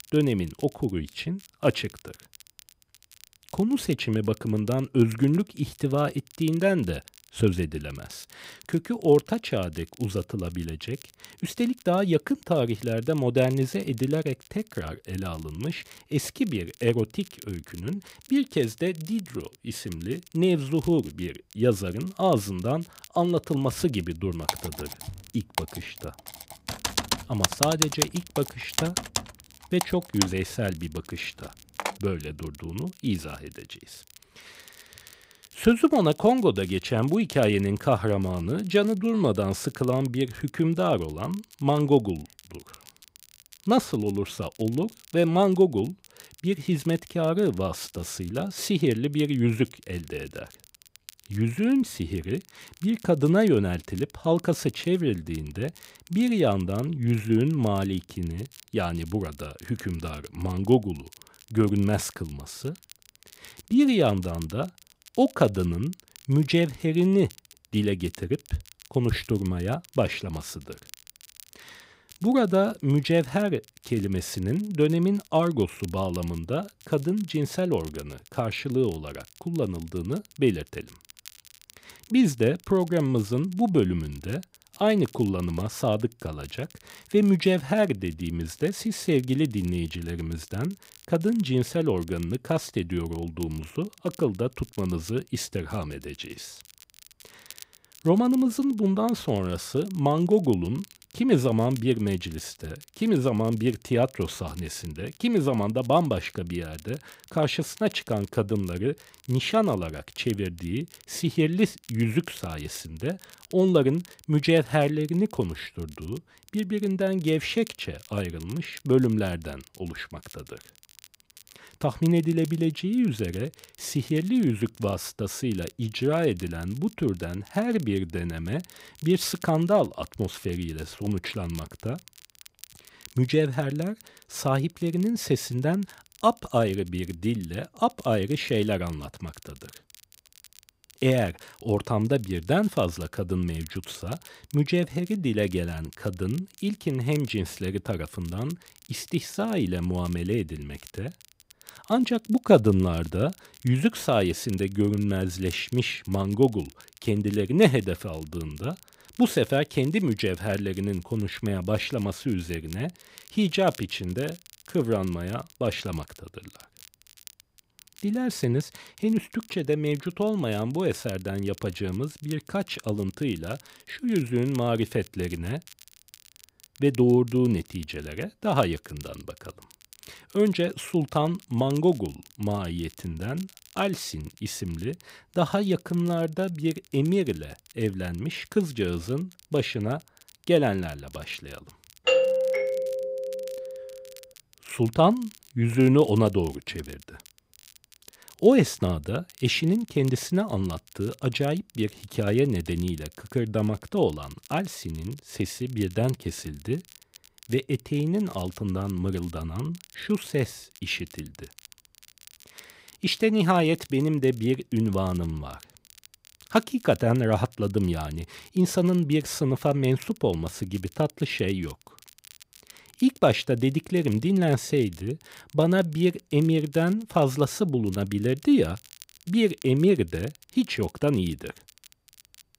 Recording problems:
crackle, like an old record; faint; 25 dB below the speech
keyboard typing; loud; from 24 to 32 s; peak 4 dB above the speech
doorbell; loud; from 3:12 to 3:14; peak 5 dB above the speech

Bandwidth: 15.5 kHz